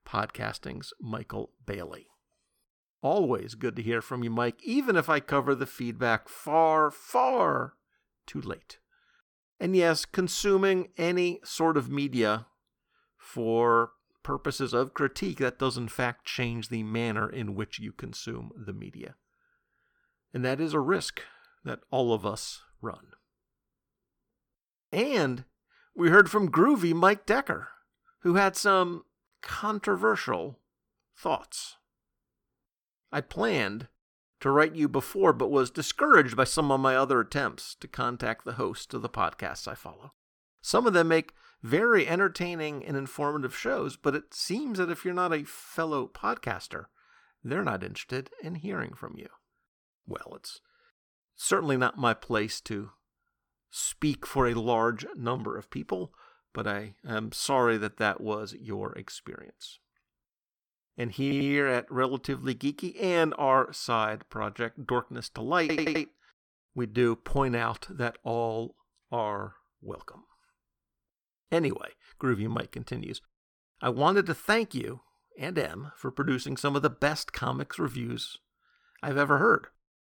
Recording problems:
audio stuttering; at 1:01 and at 1:06

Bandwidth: 18 kHz